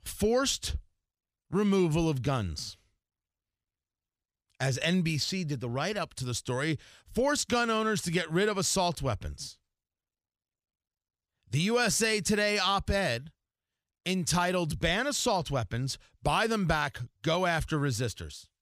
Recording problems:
none

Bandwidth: 15 kHz